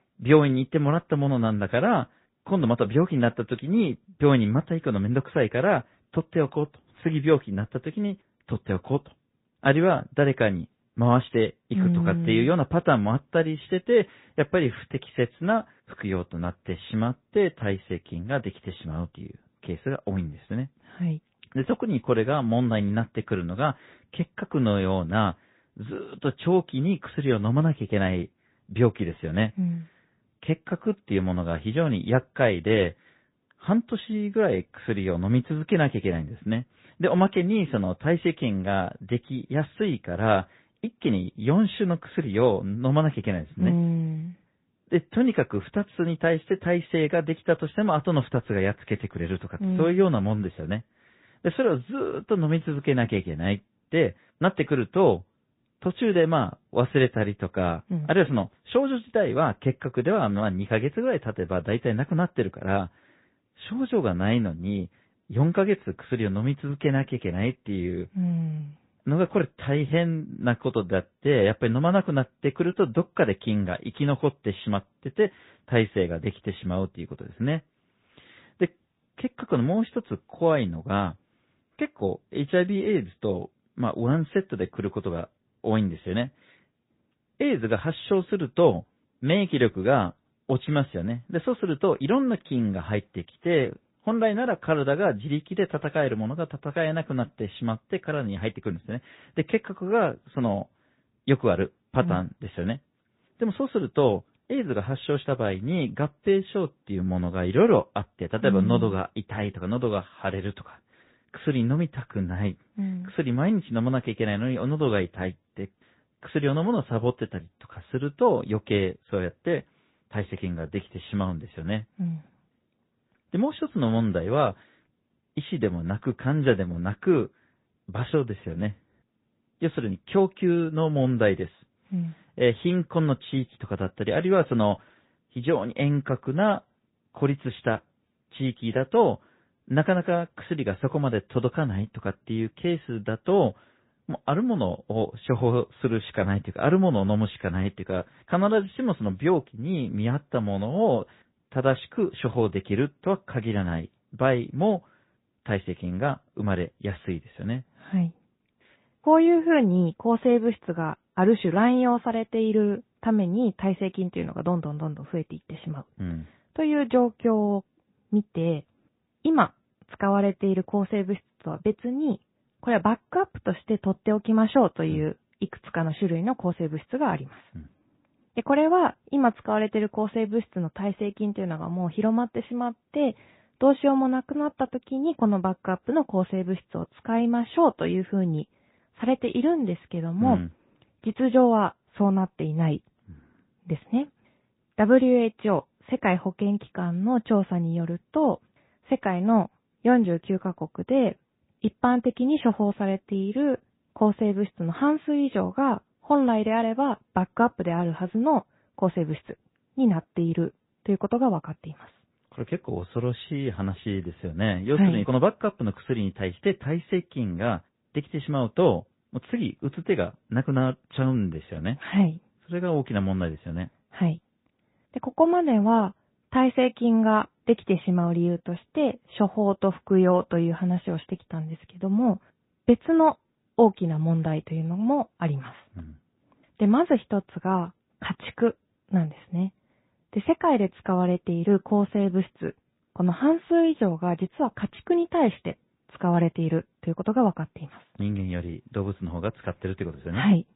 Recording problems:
high frequencies cut off; severe; nothing above 4 kHz
garbled, watery; slightly

